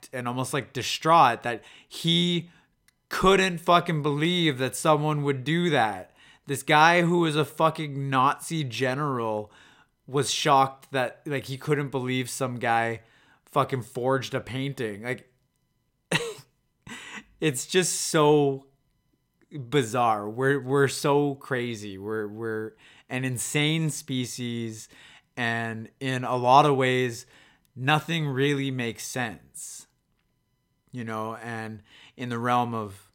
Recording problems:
none

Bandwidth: 16.5 kHz